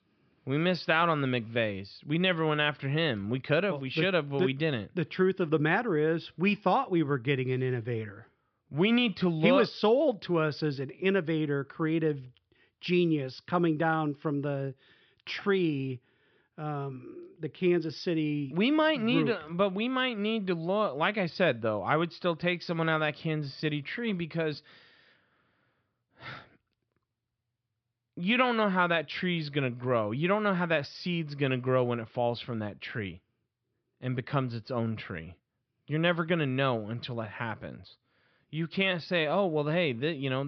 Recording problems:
high frequencies cut off; noticeable; nothing above 5.5 kHz
abrupt cut into speech; at the end

